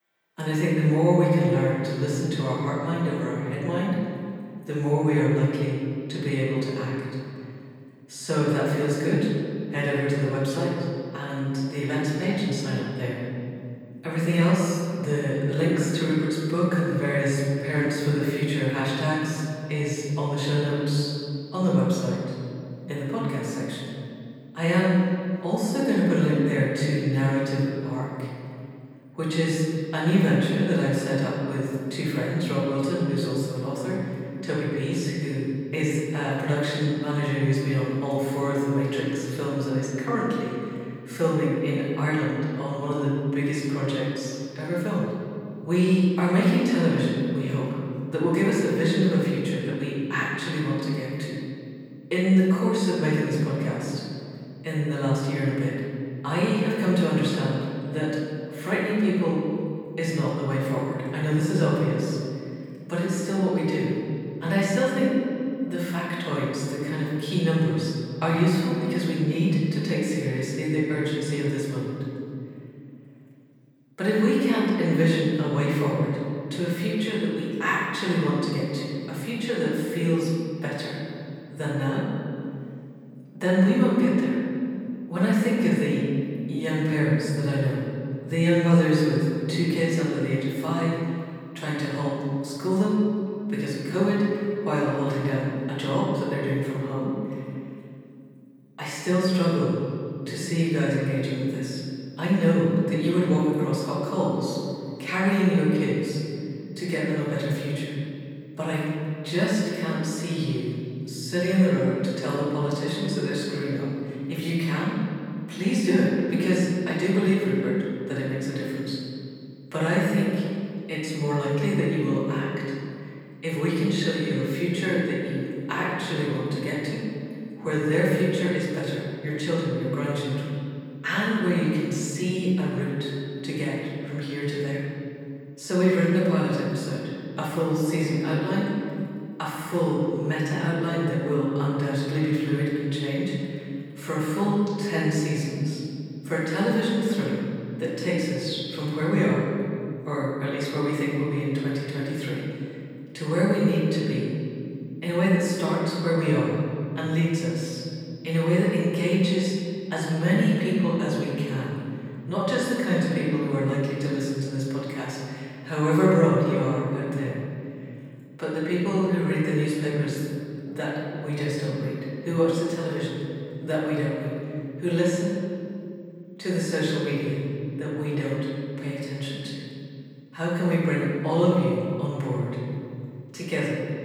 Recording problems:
room echo; strong; dies away in 2.5 s
off-mic speech; far

